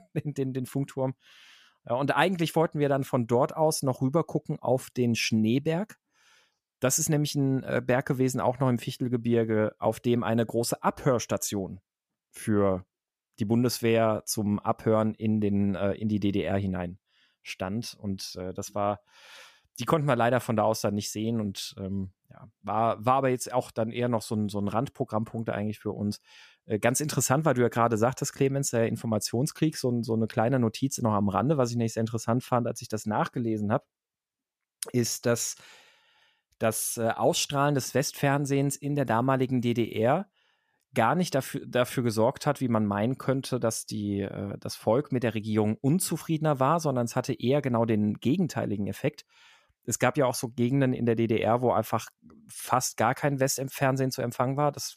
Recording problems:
none

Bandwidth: 14.5 kHz